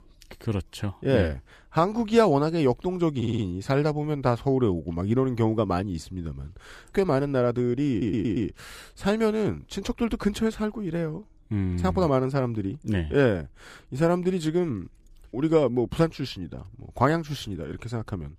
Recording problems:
audio stuttering; at 3 s and at 8 s

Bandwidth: 14.5 kHz